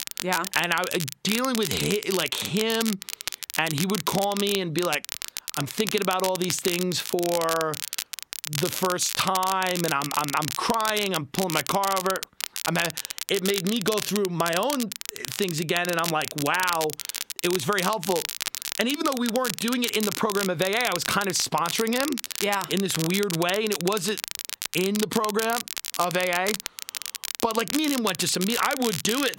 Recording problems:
squashed, flat; somewhat
crackle, like an old record; loud; 5 dB below the speech

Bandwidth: 16 kHz